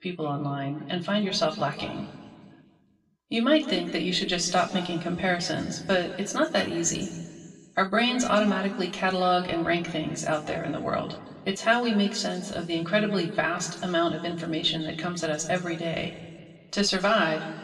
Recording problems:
room echo; slight; dies away in 1.6 s
off-mic speech; somewhat distant

